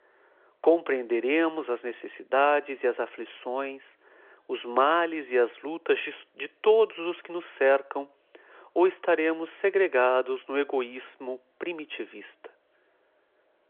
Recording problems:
phone-call audio

